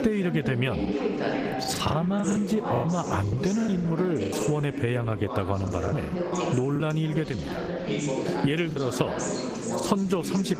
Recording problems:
garbled, watery; slightly; nothing above 15 kHz
squashed, flat; somewhat, background pumping
background chatter; loud; throughout; 3 voices, 4 dB below the speech
choppy; very; 10% of the speech affected

